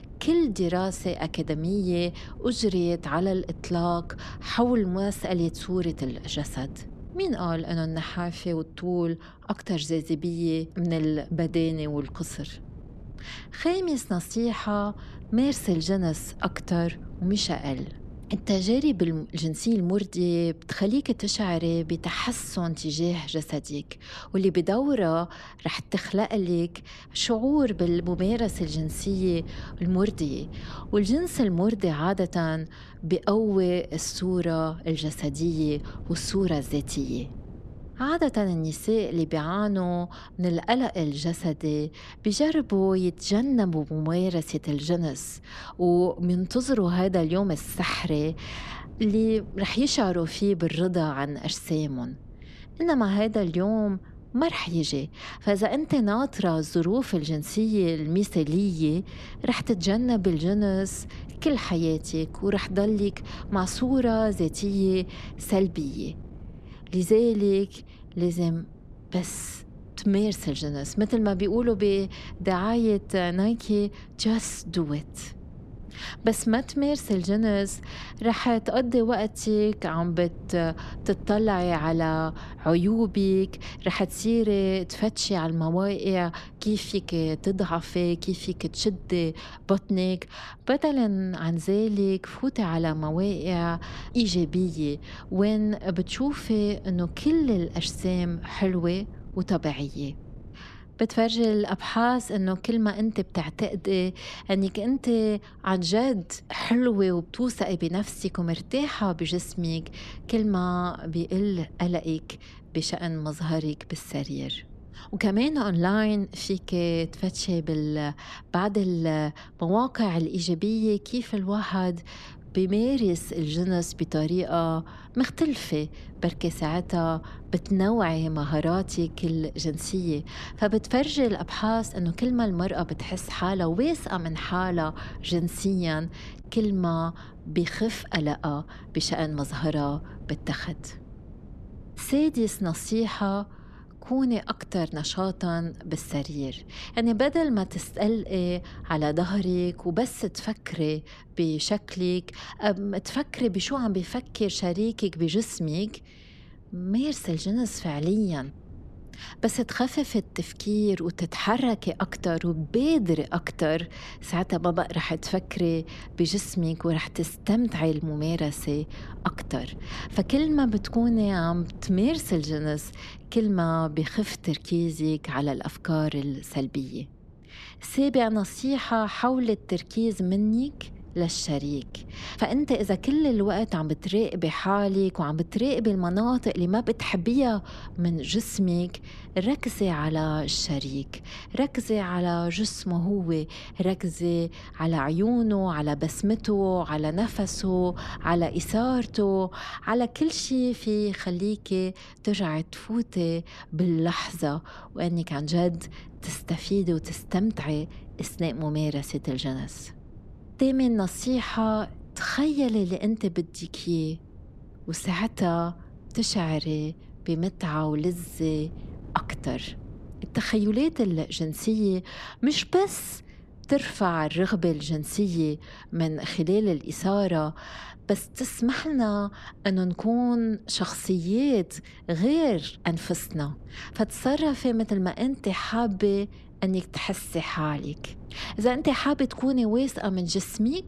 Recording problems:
wind noise on the microphone; occasional gusts; 25 dB below the speech

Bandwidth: 13.5 kHz